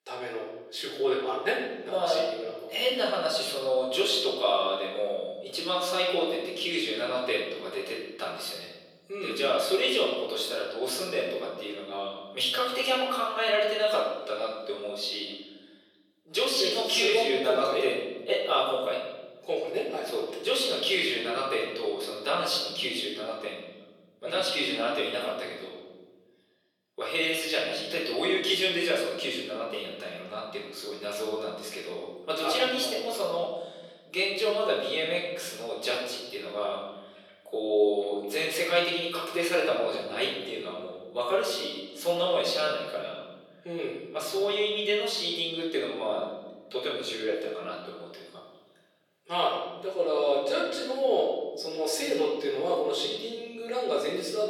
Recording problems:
off-mic speech; far
thin; very; fading below 350 Hz
room echo; noticeable; dies away in 1.3 s

